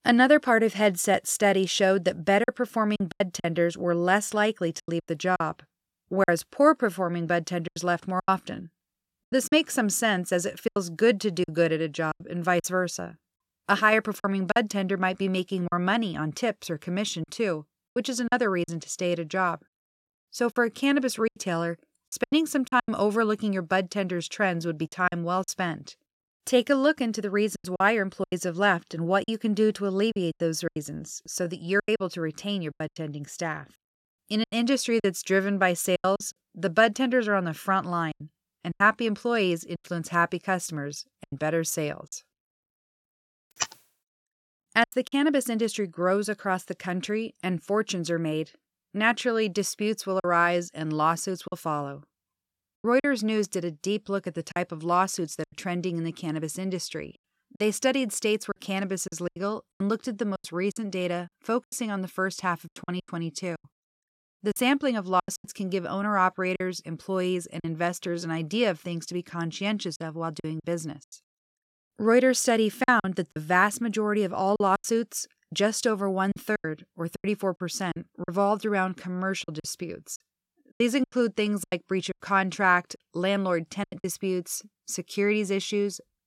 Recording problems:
choppy; very; 8% of the speech affected

